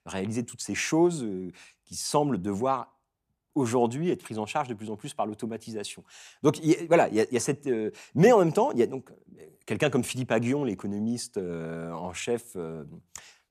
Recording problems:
none

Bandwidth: 15 kHz